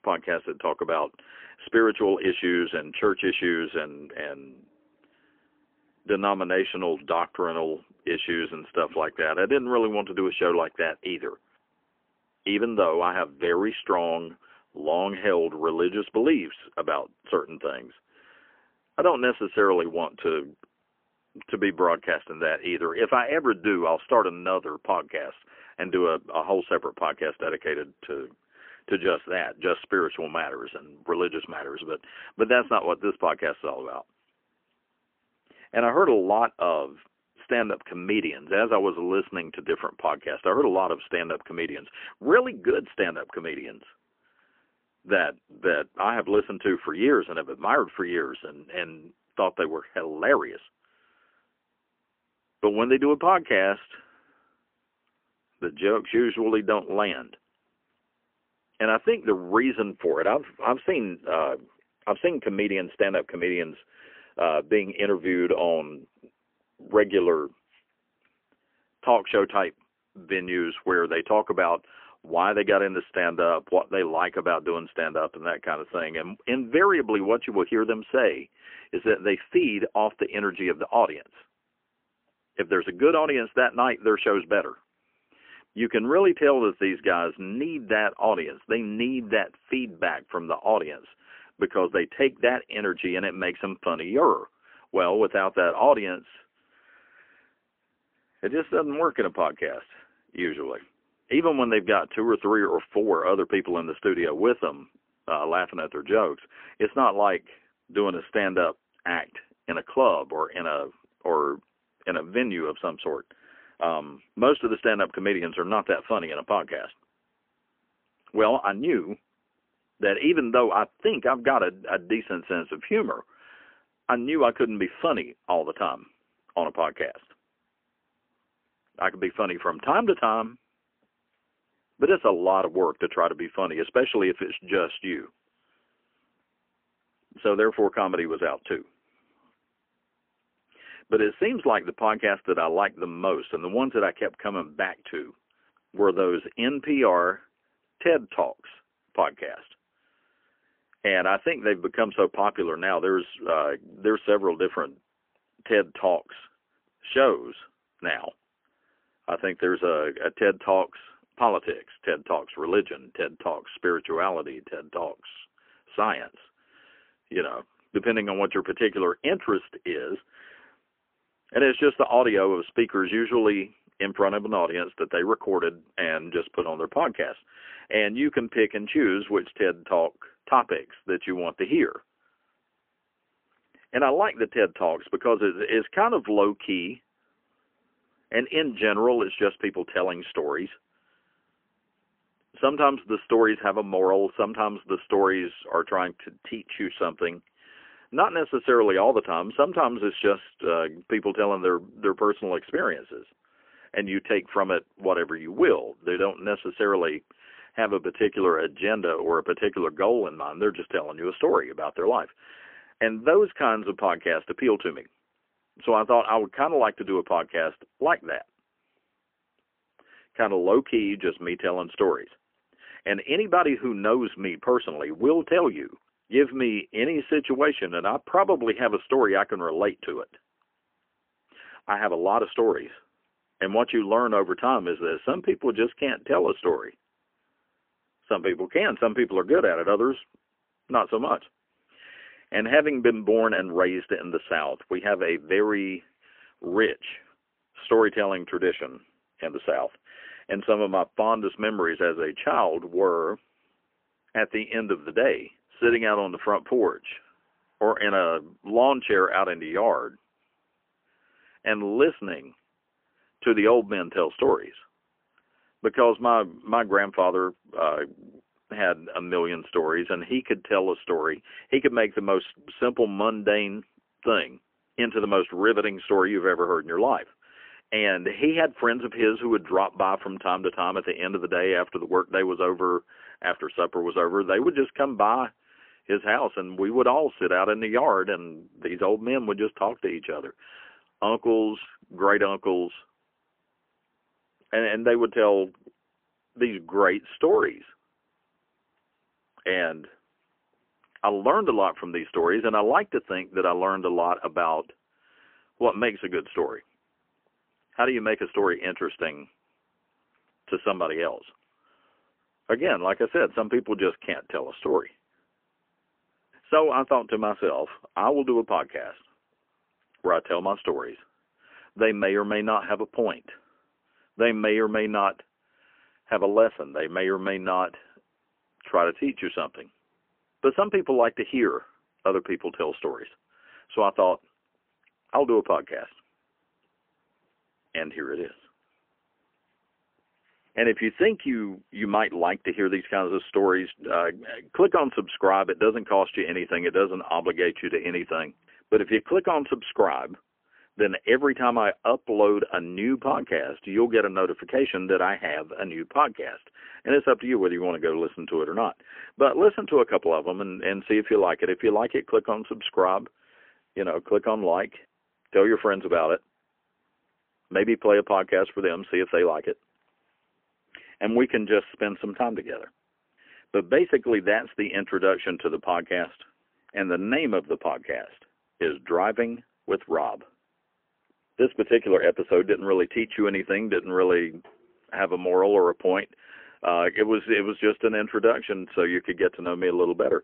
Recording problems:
phone-call audio; poor line; nothing above 3 kHz

